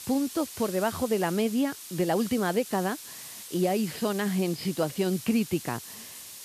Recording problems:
high frequencies cut off; noticeable; nothing above 5.5 kHz
hiss; noticeable; throughout; 10 dB below the speech

